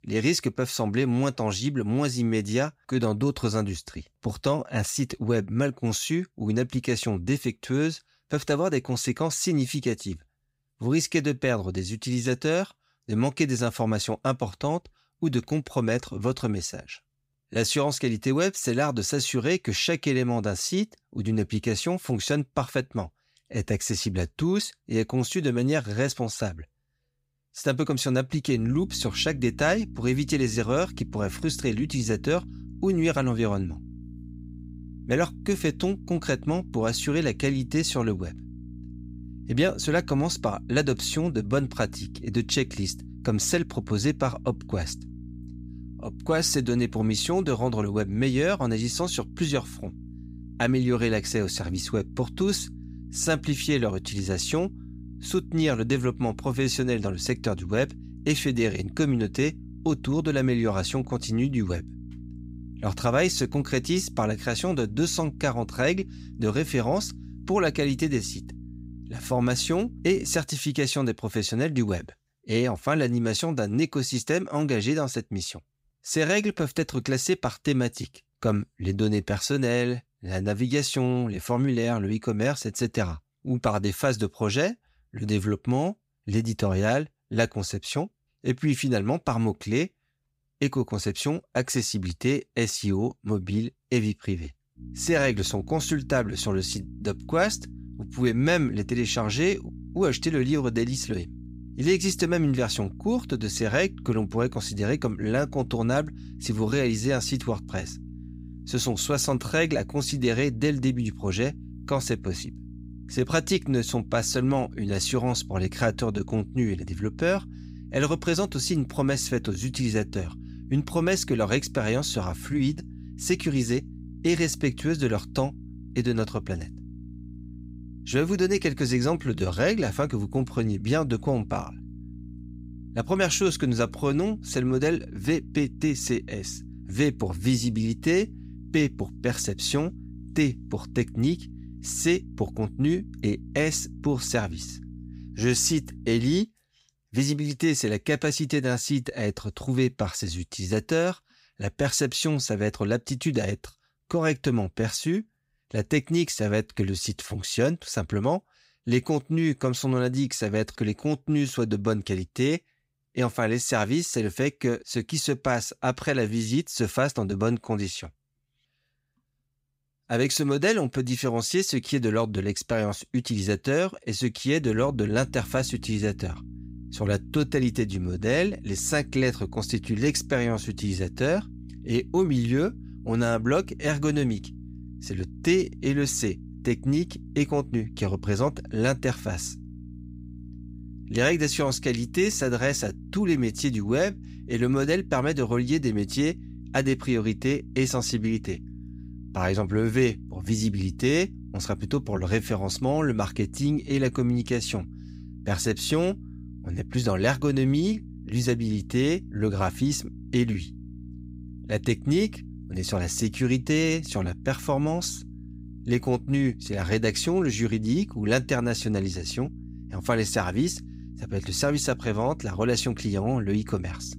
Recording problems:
electrical hum; faint; from 29 s to 1:10, from 1:35 to 2:26 and from 2:55 on; 60 Hz, 20 dB below the speech

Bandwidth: 15.5 kHz